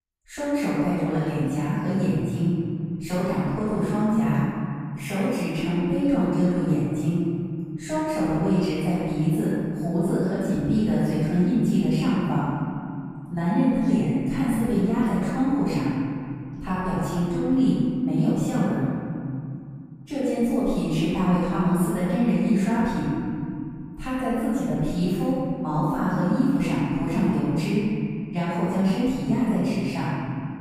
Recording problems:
room echo; strong; dies away in 2.7 s
off-mic speech; far

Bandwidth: 15 kHz